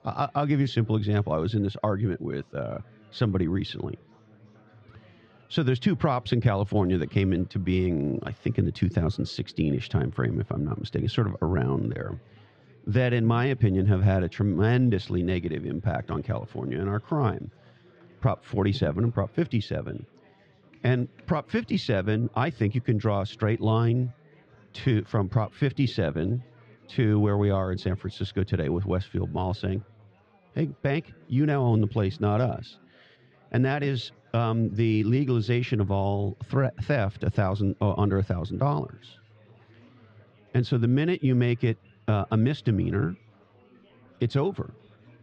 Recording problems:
muffled; slightly; fading above 4 kHz
chatter from many people; faint; throughout; 30 dB below the speech

